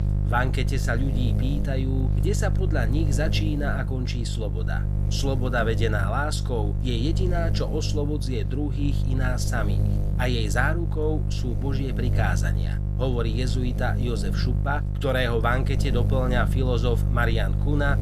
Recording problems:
electrical hum; loud; throughout; 50 Hz, 9 dB below the speech

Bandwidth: 14.5 kHz